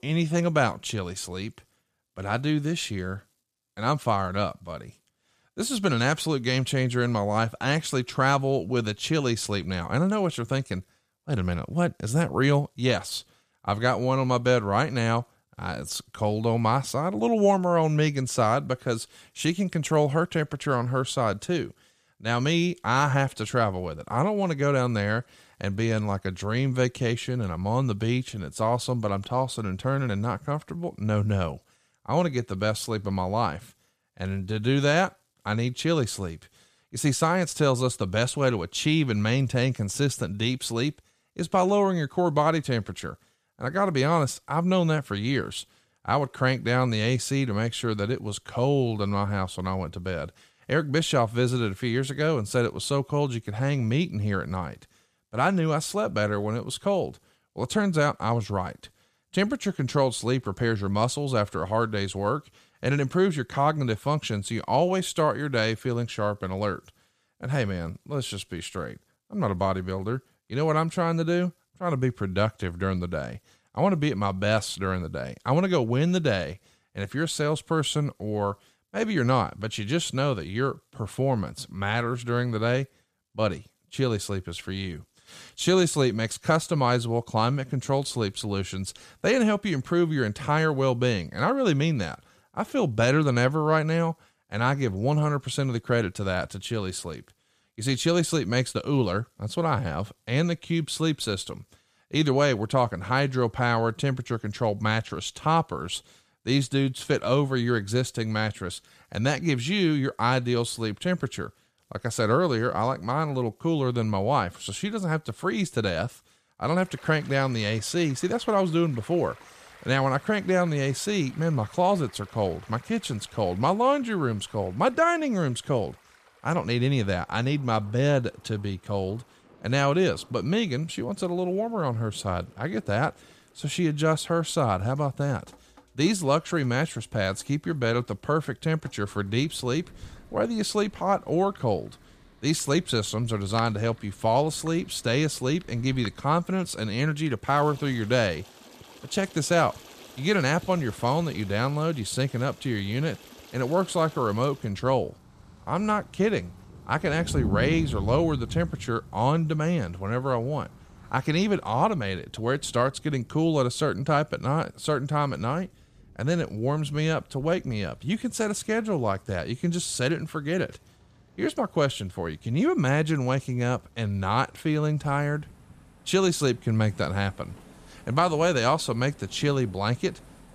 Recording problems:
rain or running water; noticeable; from 1:57 on; 20 dB below the speech

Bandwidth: 14.5 kHz